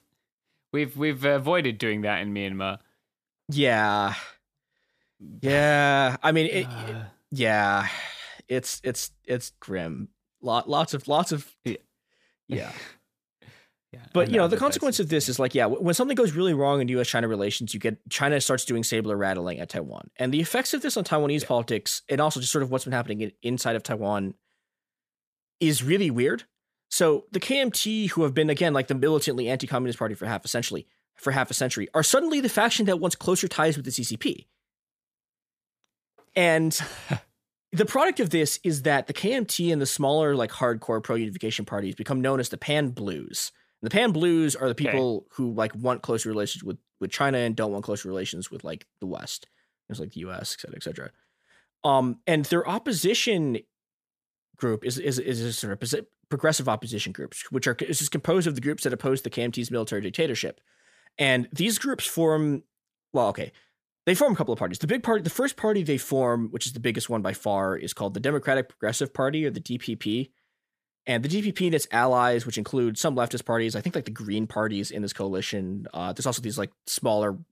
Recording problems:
none

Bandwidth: 14.5 kHz